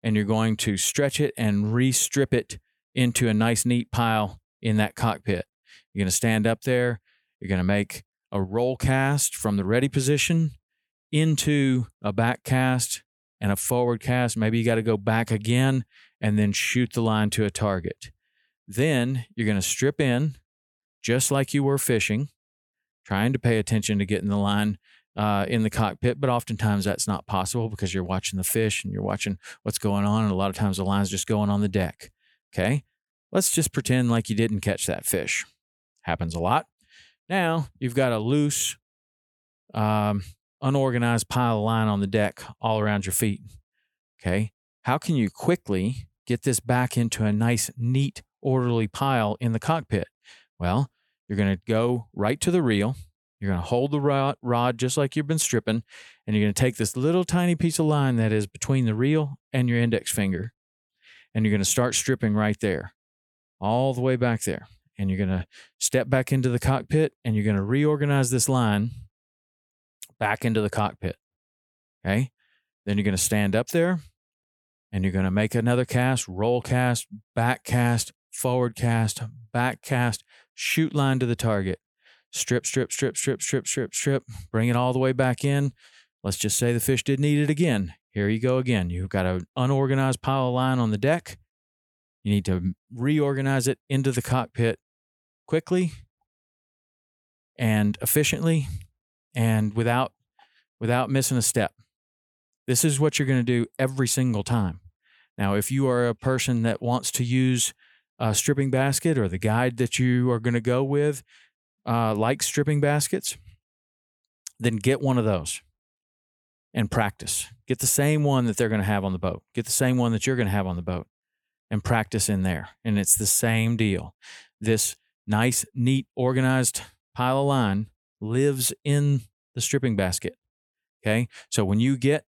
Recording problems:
none

